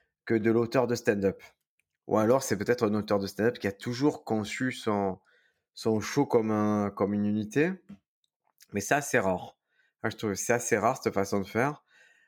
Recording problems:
none

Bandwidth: 18.5 kHz